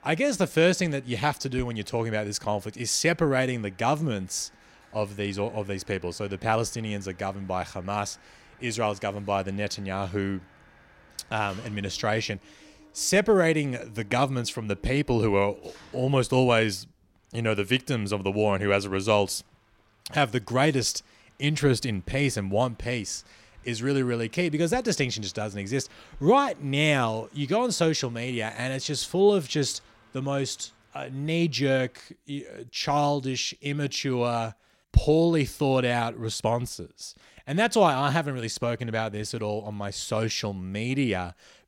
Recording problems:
machinery noise; faint; throughout; 30 dB below the speech

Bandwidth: 16 kHz